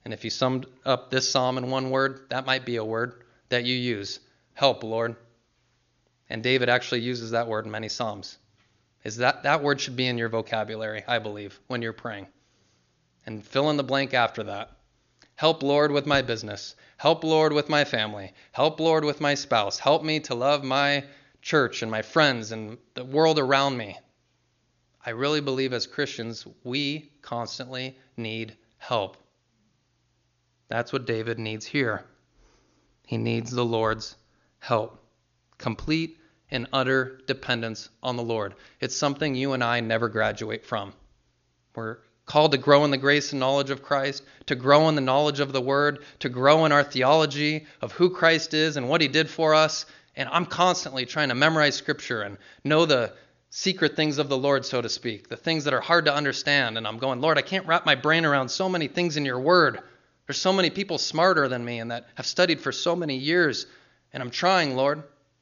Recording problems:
high frequencies cut off; noticeable; nothing above 7 kHz

